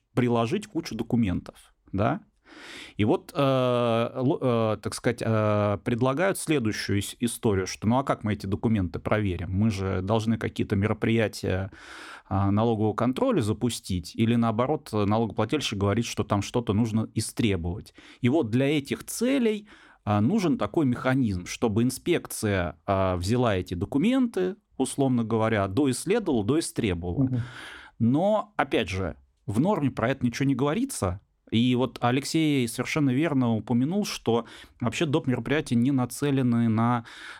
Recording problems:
none

